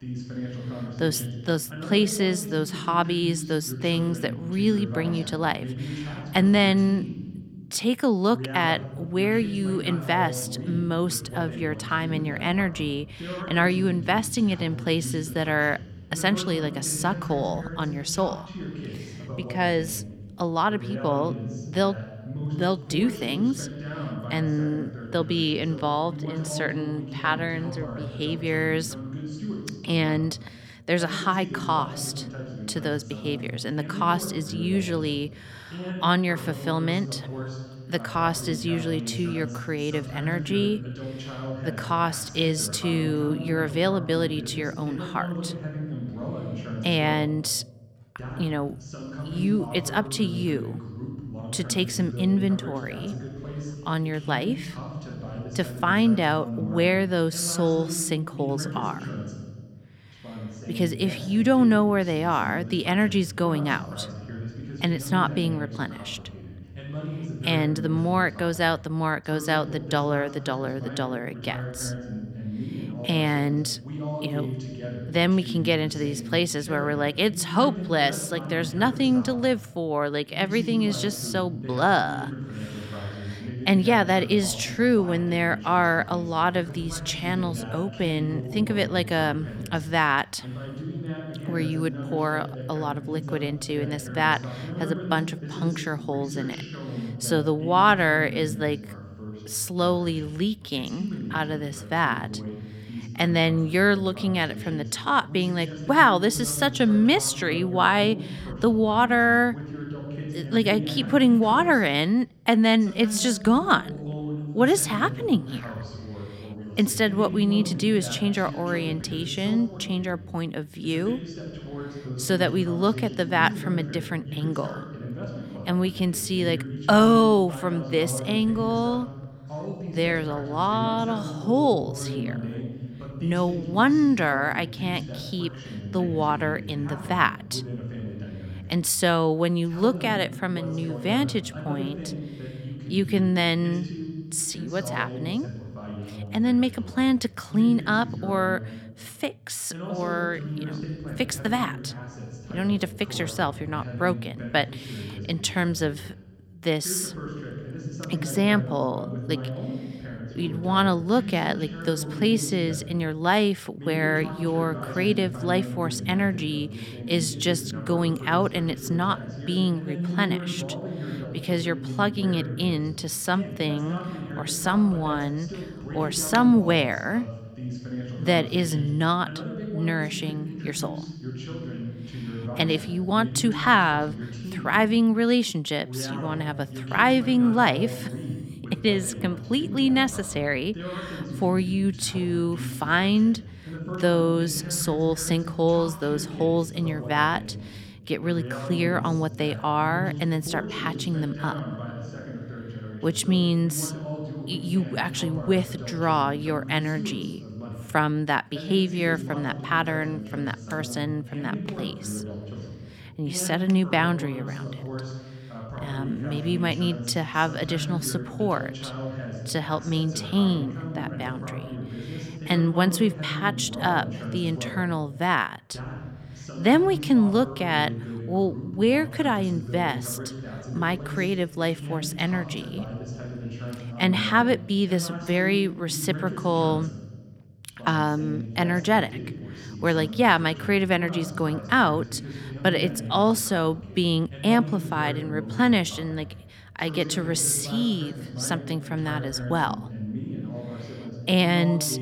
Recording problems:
voice in the background; noticeable; throughout; 10 dB below the speech

